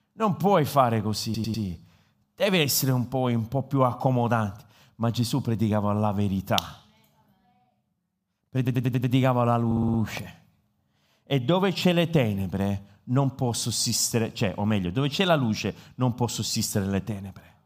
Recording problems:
audio stuttering; at 1 s, at 8.5 s and at 9.5 s

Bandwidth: 15 kHz